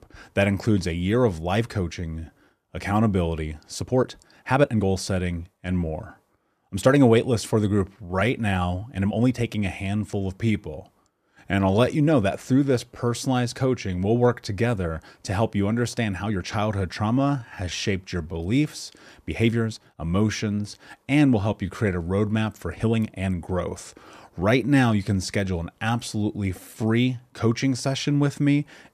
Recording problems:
uneven, jittery; strongly; from 2 to 27 s

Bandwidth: 14.5 kHz